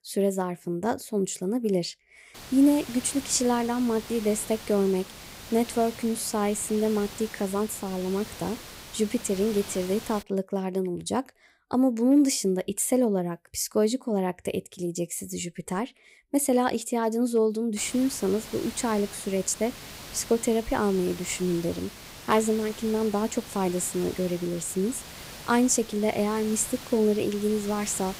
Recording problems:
hiss; noticeable; from 2.5 to 10 s and from 18 s on; 15 dB below the speech

